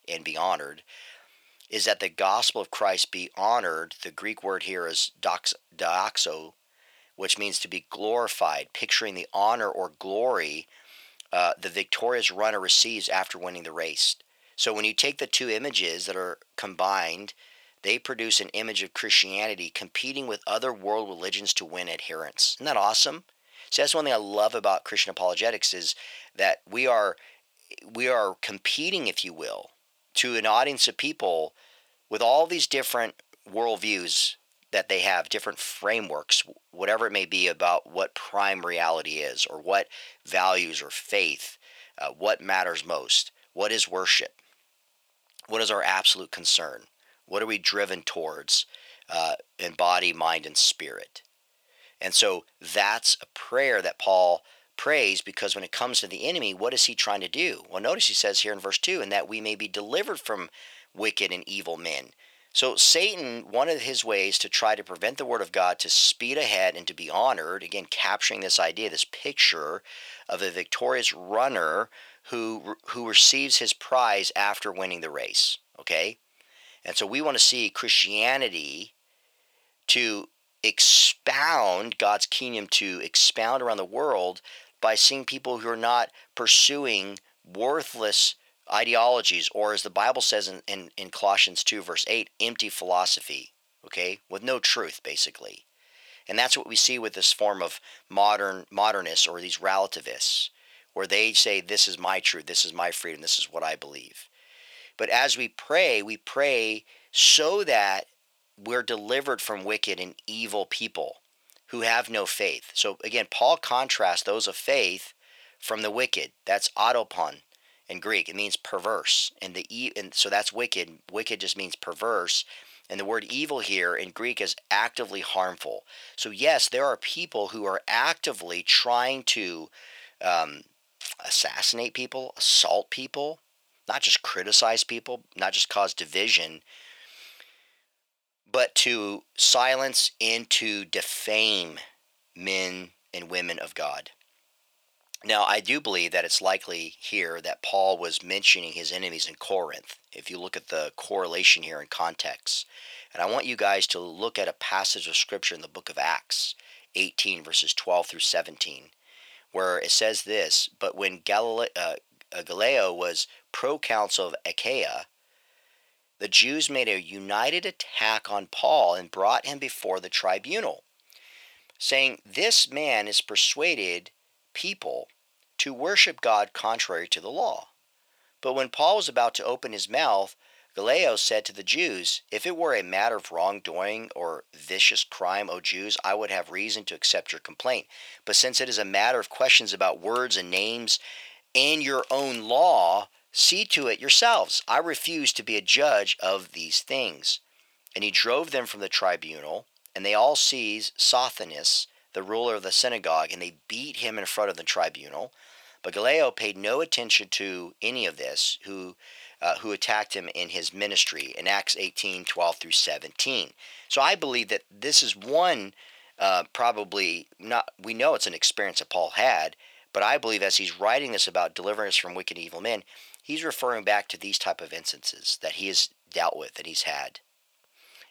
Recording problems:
thin; very; fading below 650 Hz

